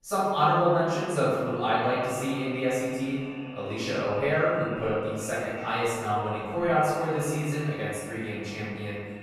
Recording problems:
room echo; strong; dies away in 1.8 s
off-mic speech; far
echo of what is said; noticeable; throughout; 460 ms later, 15 dB below the speech

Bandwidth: 13.5 kHz